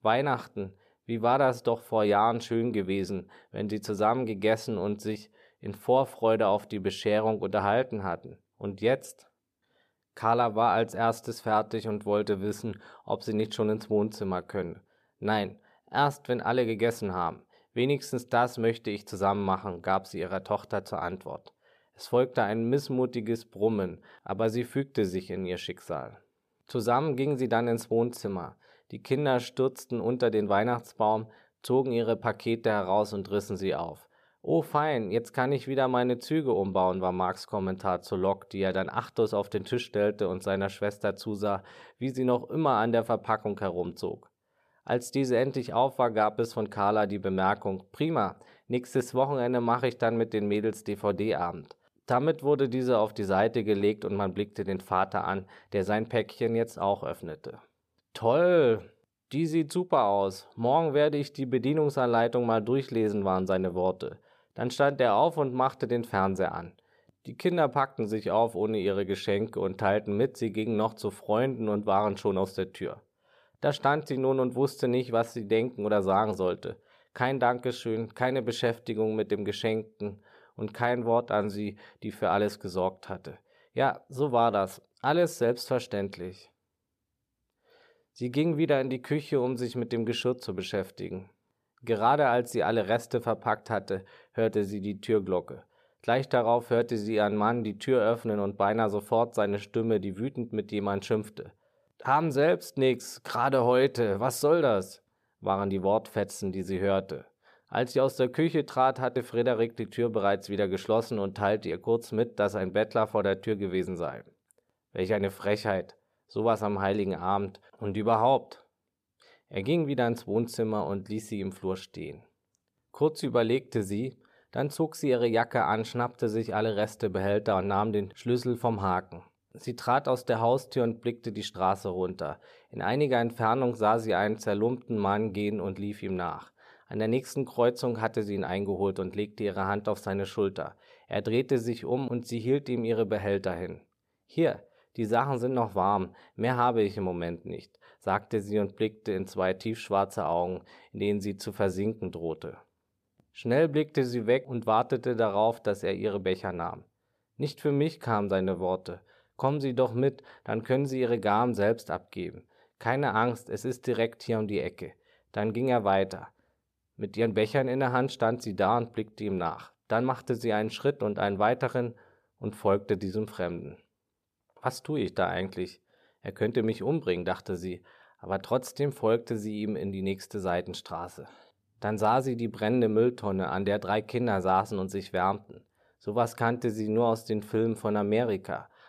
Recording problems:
none

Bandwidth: 14.5 kHz